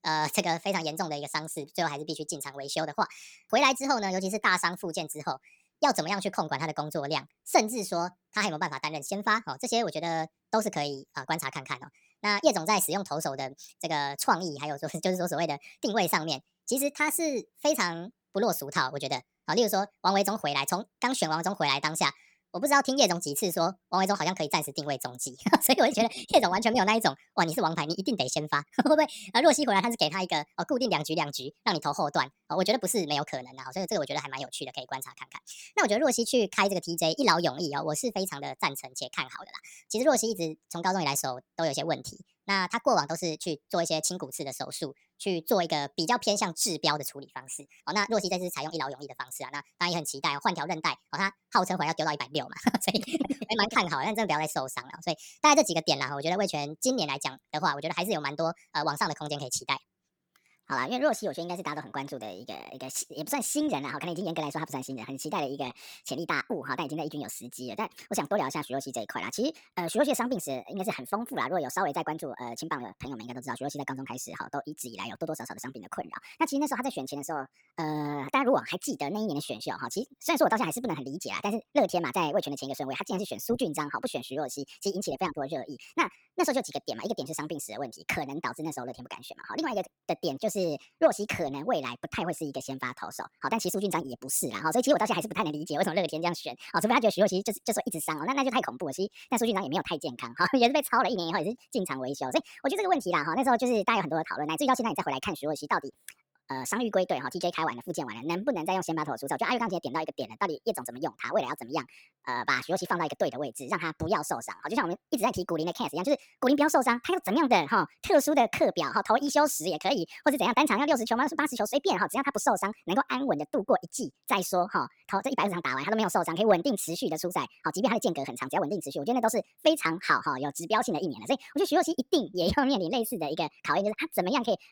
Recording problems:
wrong speed and pitch; too fast and too high; 1.5 times normal speed

